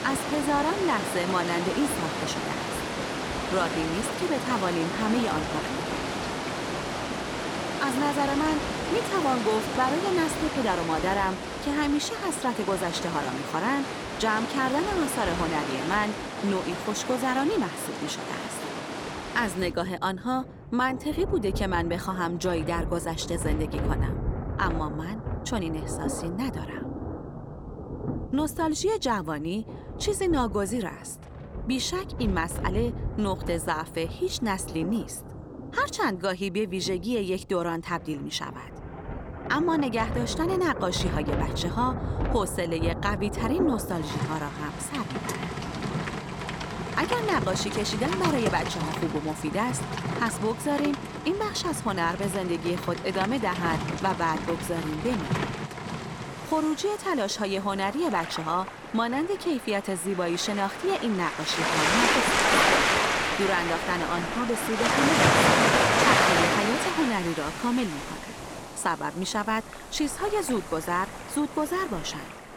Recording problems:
rain or running water; loud; throughout; 1 dB below the speech

